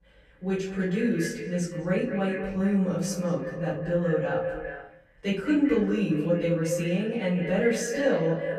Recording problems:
echo of what is said; strong; throughout; 200 ms later, 6 dB below the speech
off-mic speech; far
room echo; noticeable; dies away in 0.4 s

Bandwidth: 14.5 kHz